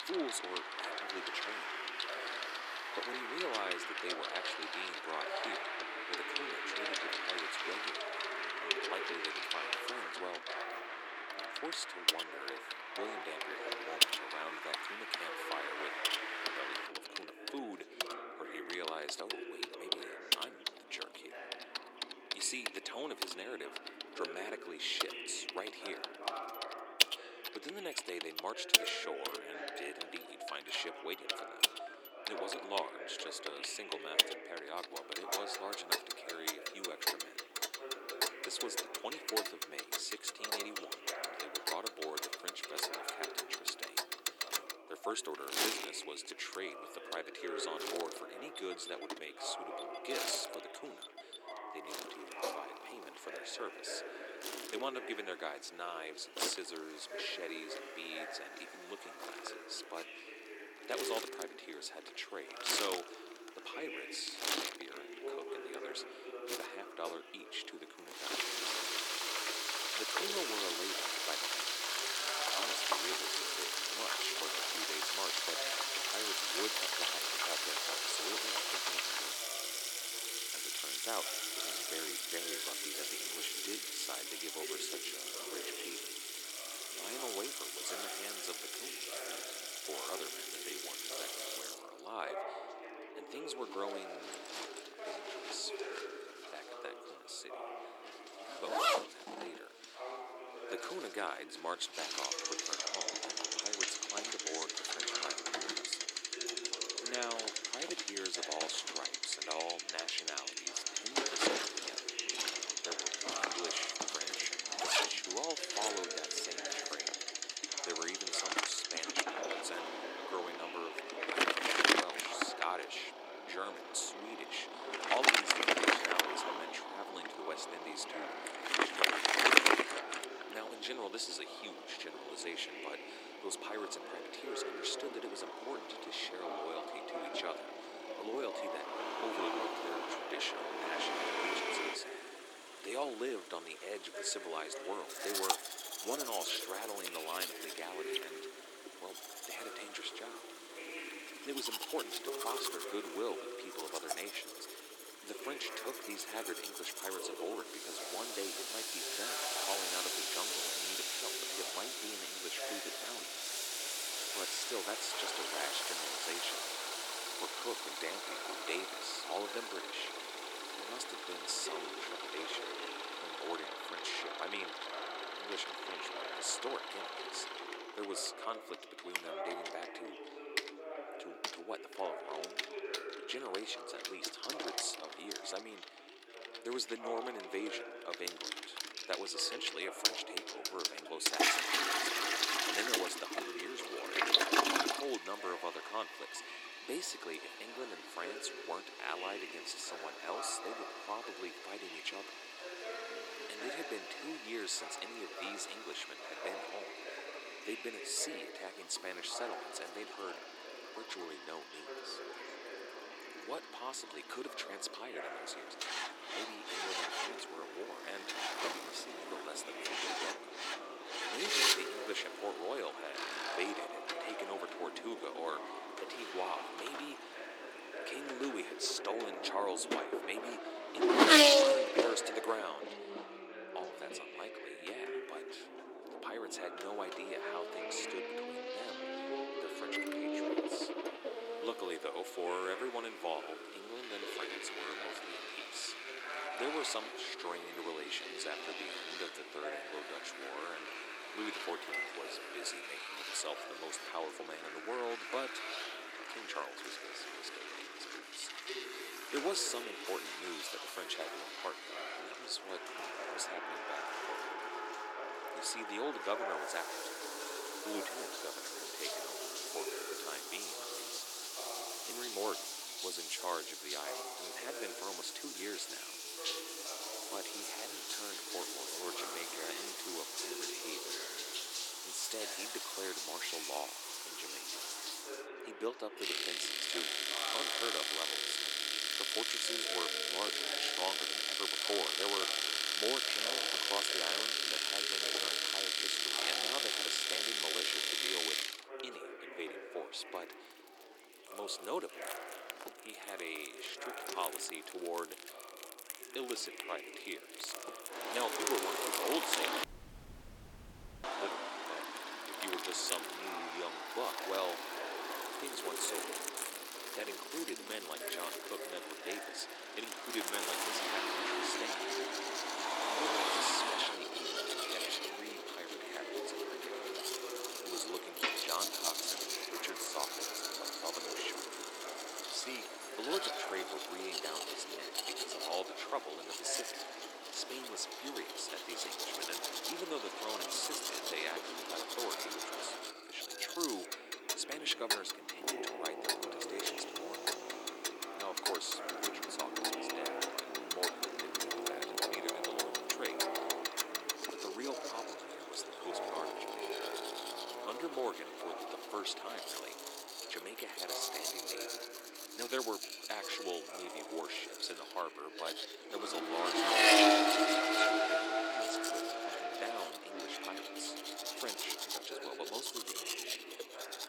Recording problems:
thin; very; fading below 300 Hz
household noises; very loud; throughout; 5 dB above the speech
traffic noise; very loud; throughout; 4 dB above the speech
background chatter; loud; throughout; 4 voices, 5 dB below the speech
audio cutting out; at 5:10 for 1.5 s

